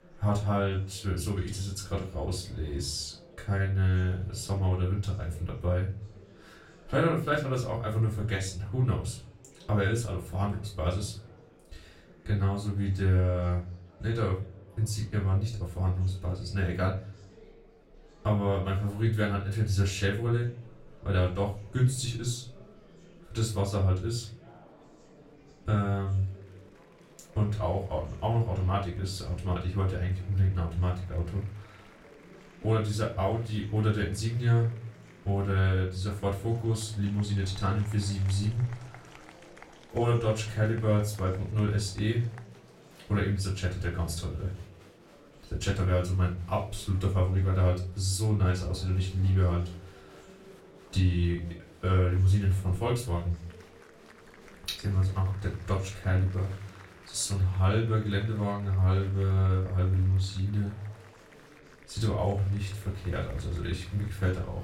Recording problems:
off-mic speech; far
room echo; slight; dies away in 0.3 s
murmuring crowd; faint; throughout; 25 dB below the speech

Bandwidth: 16.5 kHz